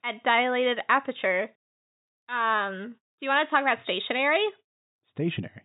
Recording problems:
high frequencies cut off; severe; nothing above 4 kHz

